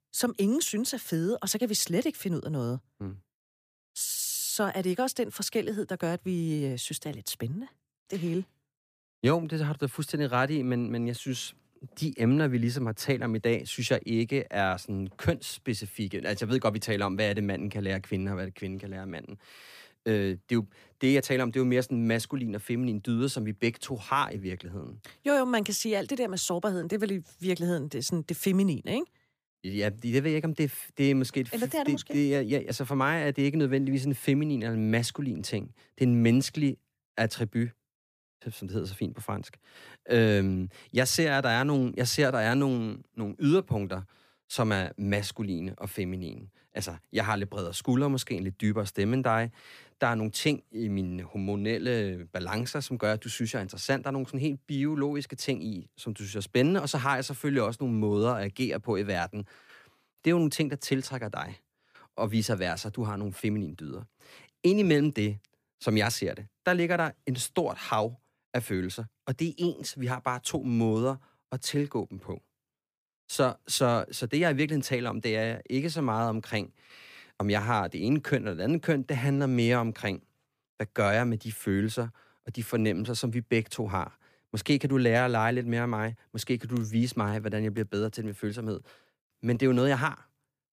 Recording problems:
none

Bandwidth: 15 kHz